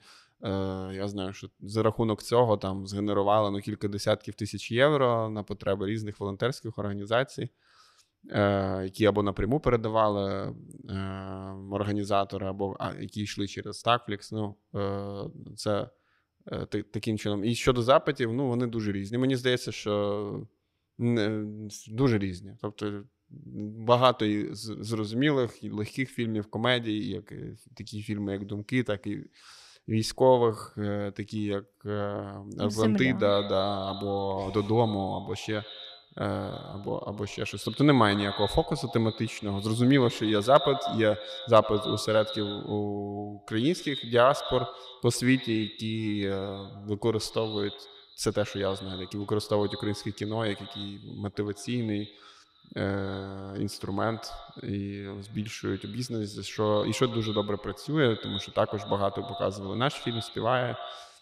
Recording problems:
echo of what is said; strong; from 33 s on; 100 ms later, 10 dB below the speech

